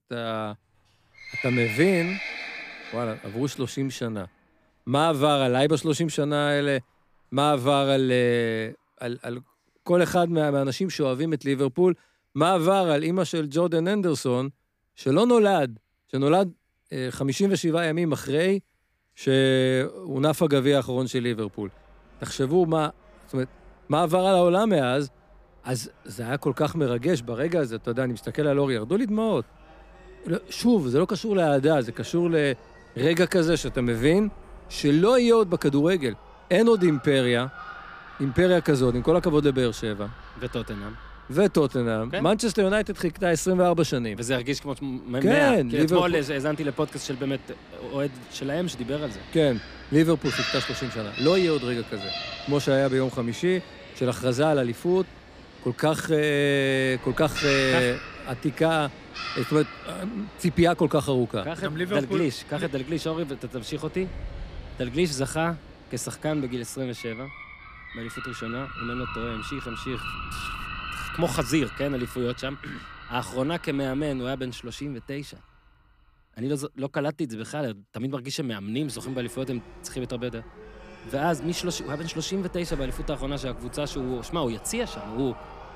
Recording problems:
animal sounds; noticeable; throughout; 15 dB below the speech

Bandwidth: 15 kHz